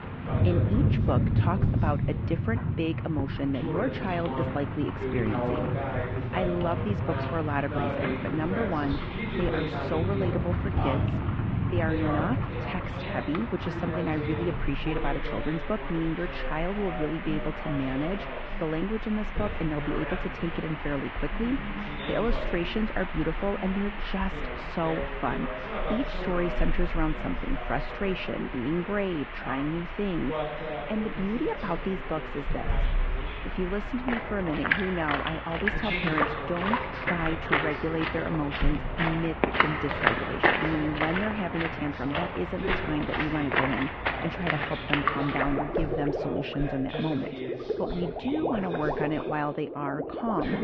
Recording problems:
muffled; very; fading above 3 kHz
garbled, watery; slightly
rain or running water; loud; throughout; as loud as the speech
voice in the background; loud; throughout; 6 dB below the speech

